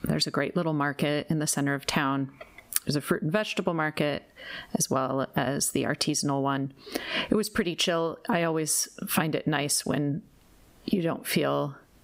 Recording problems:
squashed, flat; somewhat

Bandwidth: 15.5 kHz